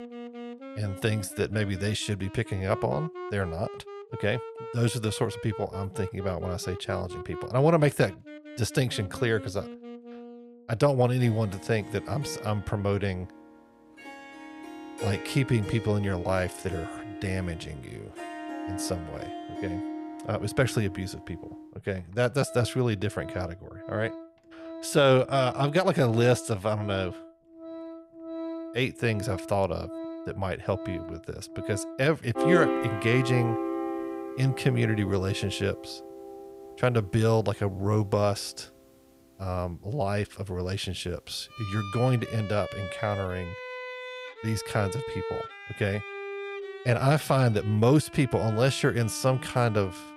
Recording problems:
background music; noticeable; throughout; 10 dB below the speech

